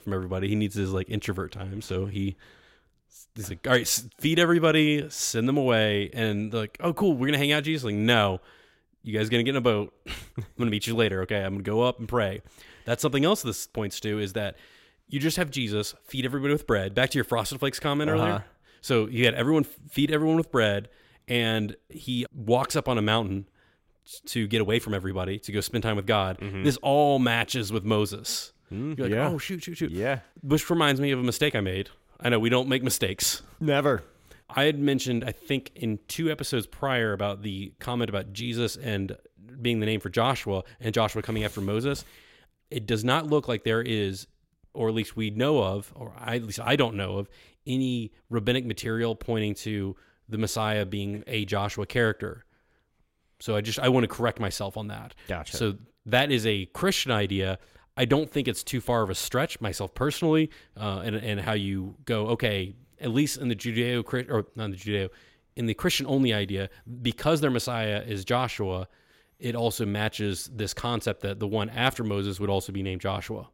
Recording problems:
none

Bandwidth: 16 kHz